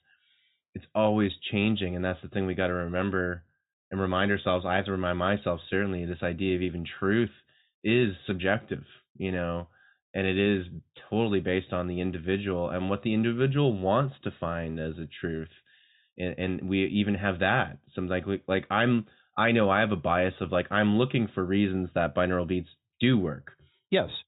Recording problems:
high frequencies cut off; severe; nothing above 4 kHz

